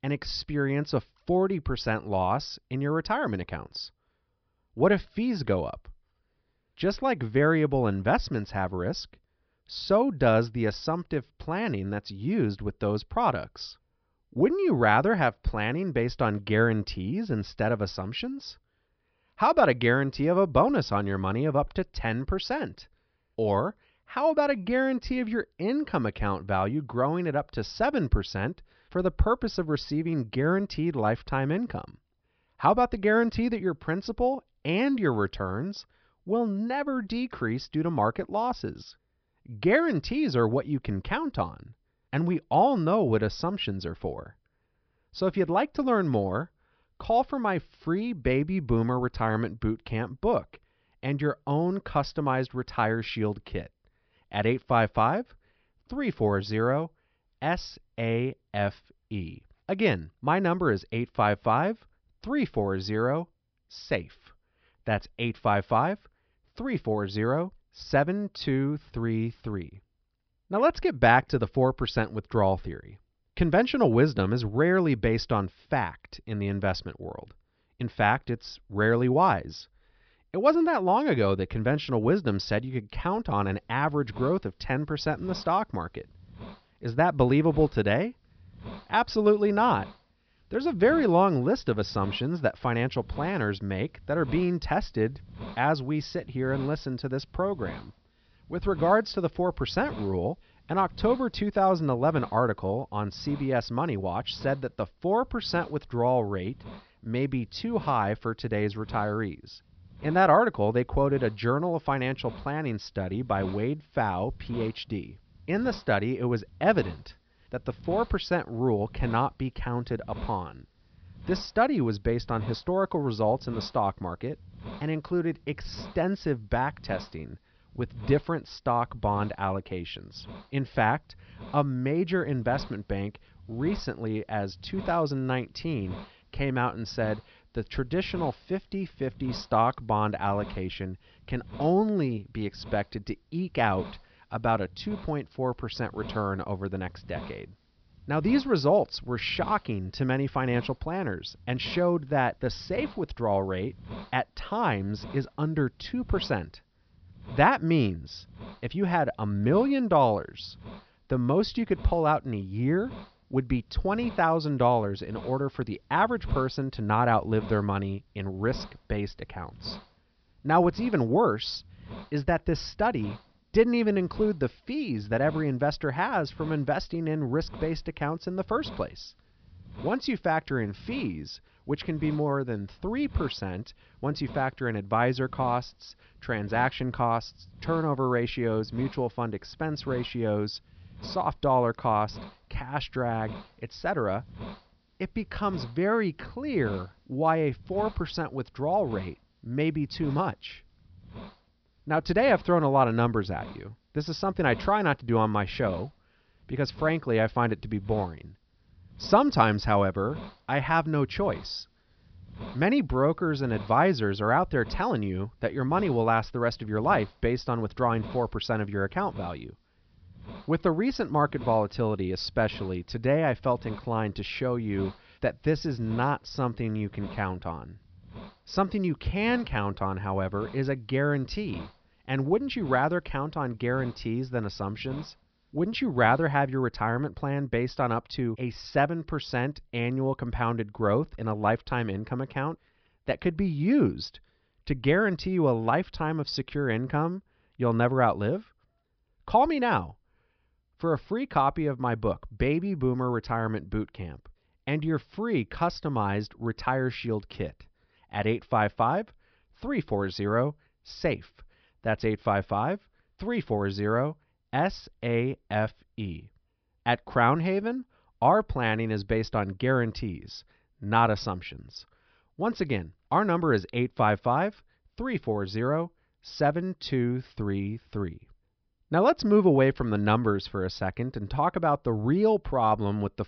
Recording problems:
high frequencies cut off; noticeable; nothing above 5.5 kHz
hiss; noticeable; from 1:23 to 3:57; 20 dB below the speech

